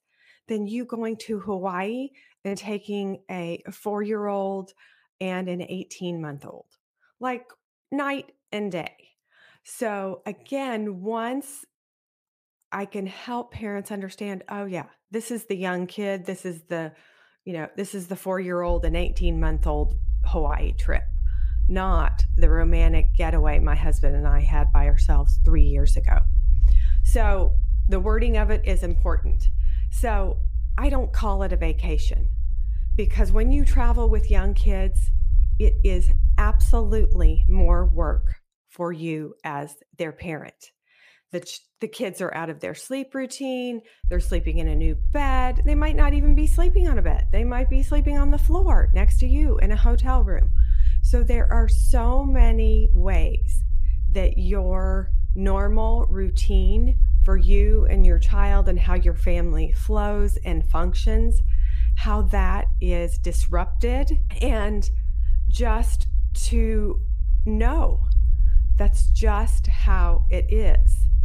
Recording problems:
low rumble; noticeable; from 19 to 38 s and from 44 s on; 15 dB below the speech

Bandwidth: 15 kHz